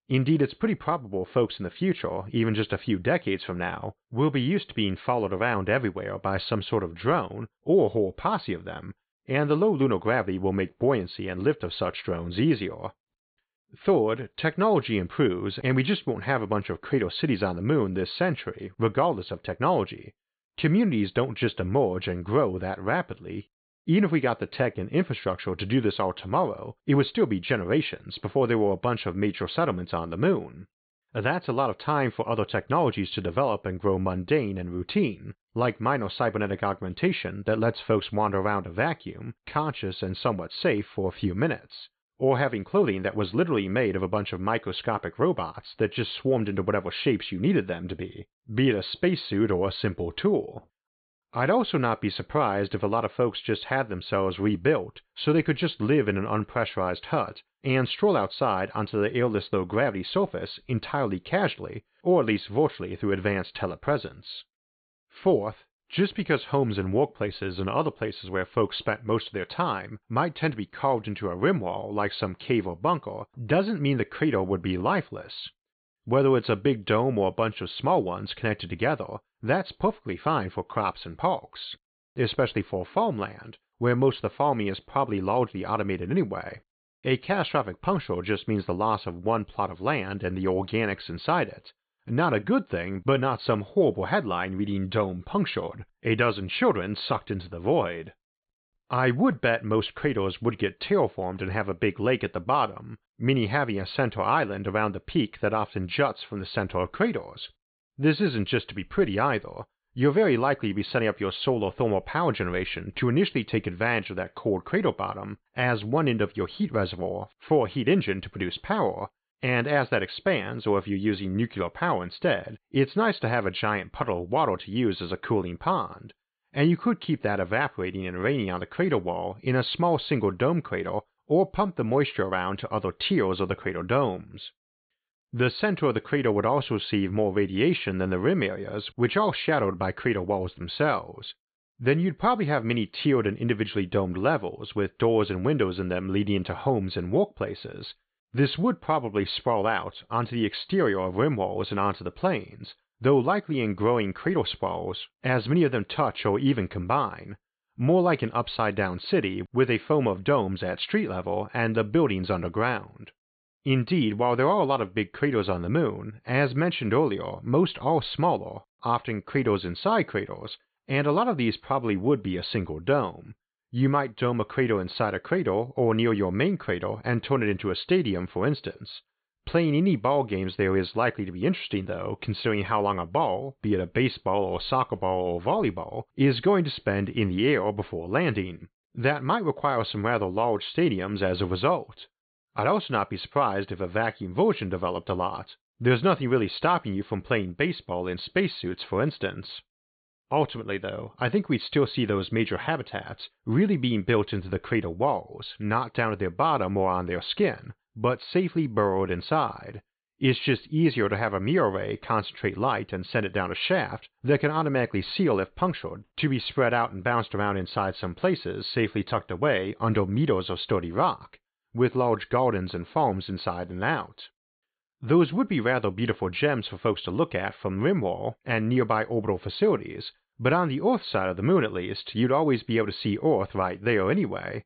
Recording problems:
high frequencies cut off; severe; nothing above 4.5 kHz

